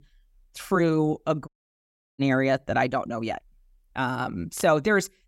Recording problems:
audio cutting out; at 1.5 s for 0.5 s

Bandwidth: 16 kHz